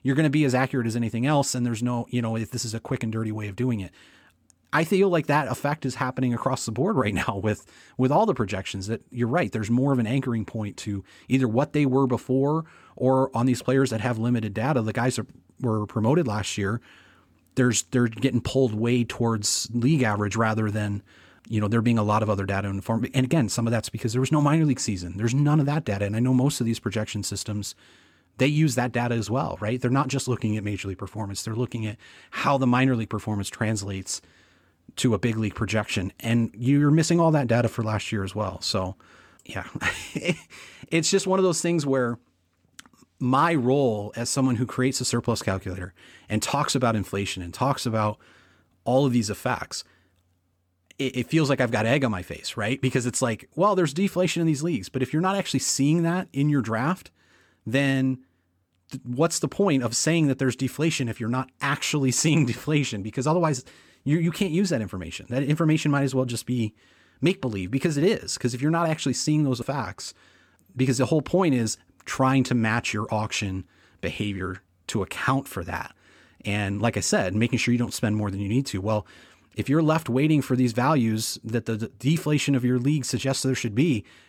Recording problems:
none

